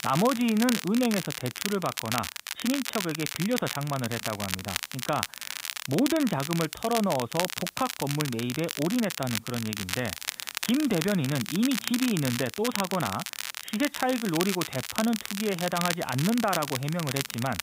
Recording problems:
high frequencies cut off; severe; nothing above 4 kHz
crackle, like an old record; loud; 4 dB below the speech
hiss; faint; throughout; 25 dB below the speech

